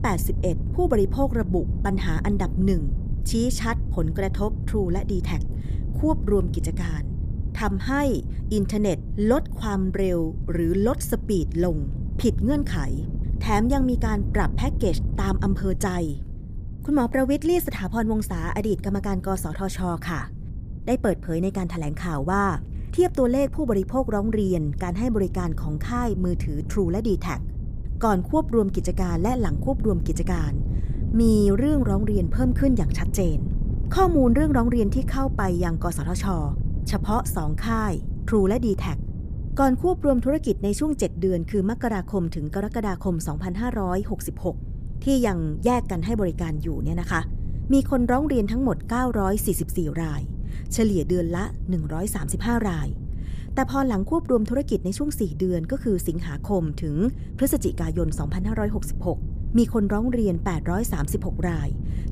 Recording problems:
wind noise on the microphone; occasional gusts; 15 dB below the speech

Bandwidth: 15 kHz